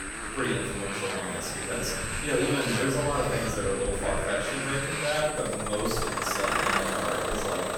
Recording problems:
off-mic speech; far
room echo; noticeable; dies away in 0.9 s
high-pitched whine; loud; throughout; 8.5 kHz, 7 dB below the speech
traffic noise; loud; throughout; 1 dB below the speech
murmuring crowd; noticeable; throughout; 15 dB below the speech

